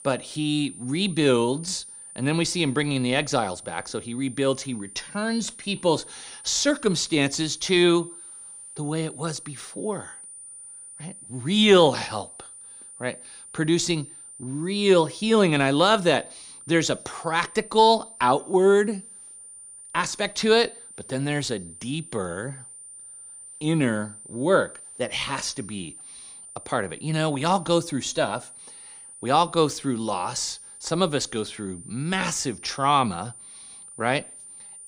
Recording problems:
high-pitched whine; noticeable; throughout; 9 kHz, 15 dB below the speech

